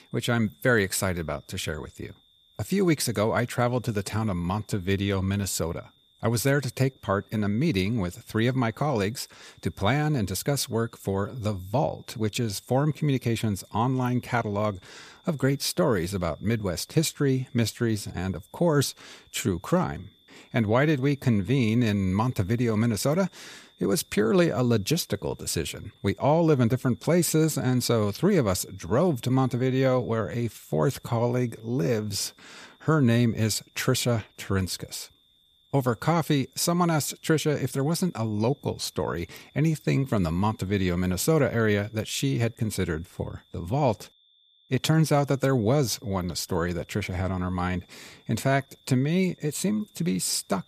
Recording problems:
high-pitched whine; faint; throughout; 3.5 kHz, 35 dB below the speech

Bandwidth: 14.5 kHz